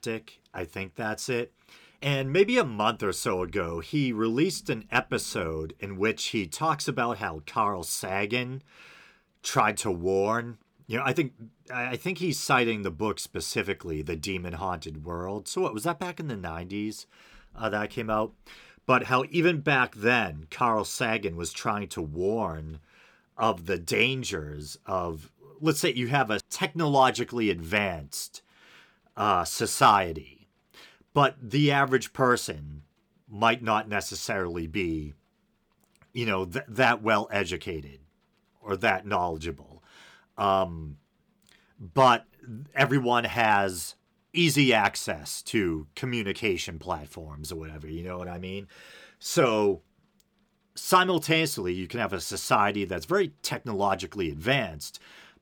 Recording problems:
none

